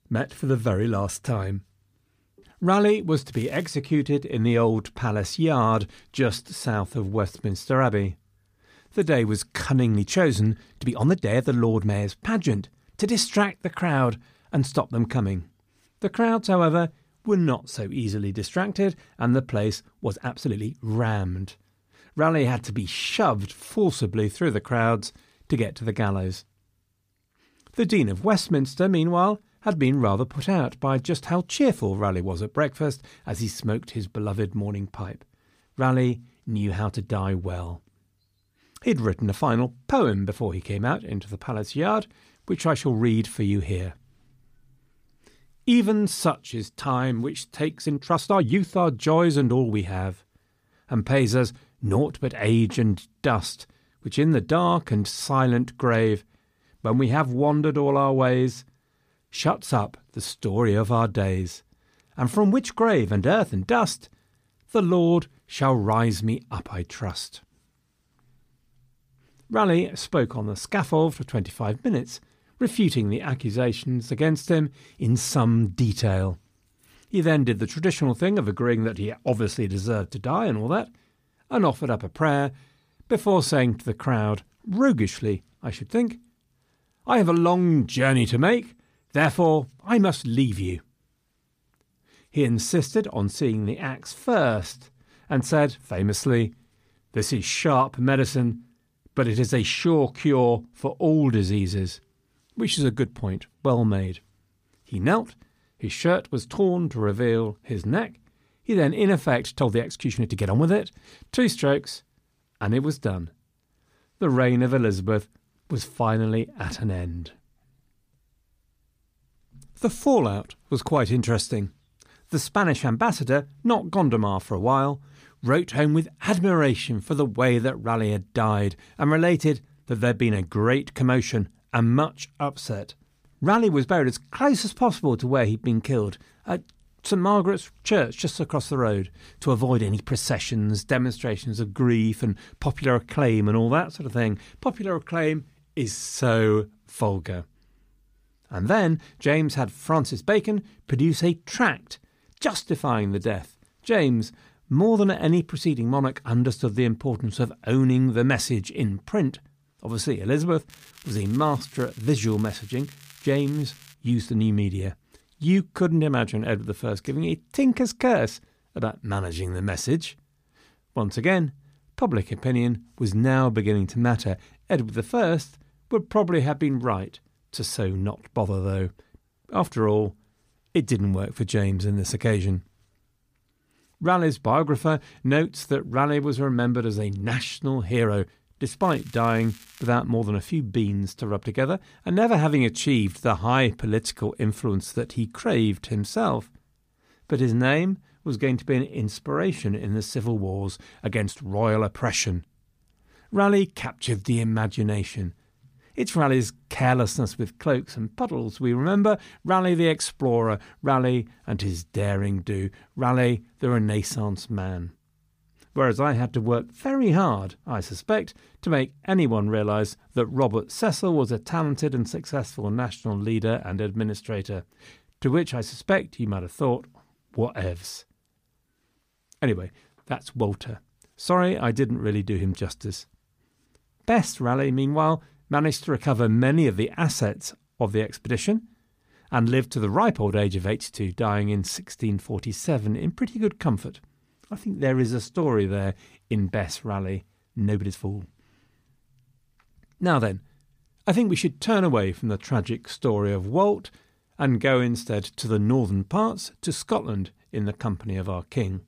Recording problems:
crackling; faint; at 3.5 s, from 2:41 to 2:44 and from 3:09 to 3:10; 25 dB below the speech
uneven, jittery; strongly; from 7 s to 4:08

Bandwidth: 15 kHz